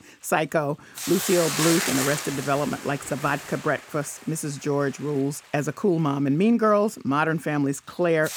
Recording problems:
hiss; loud; throughout; 4 dB below the speech

